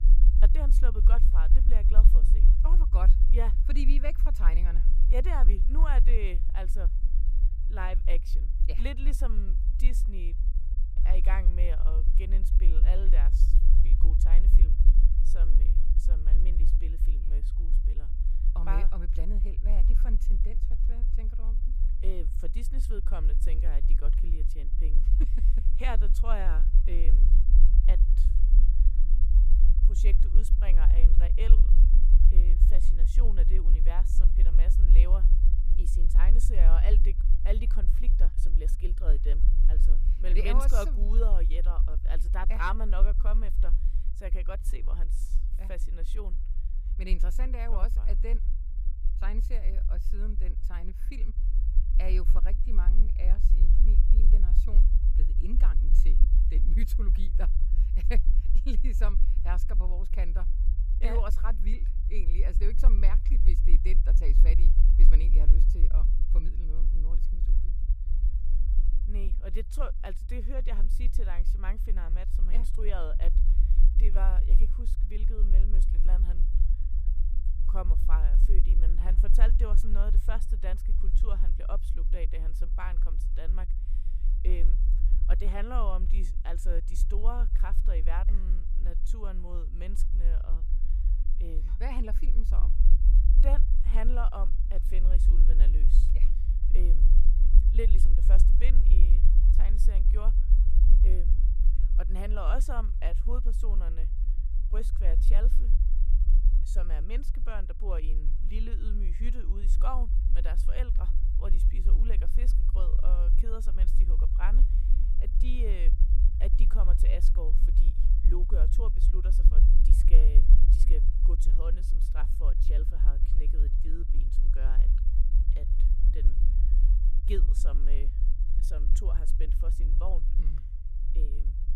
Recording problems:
low rumble; loud; throughout; 8 dB below the speech

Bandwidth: 15.5 kHz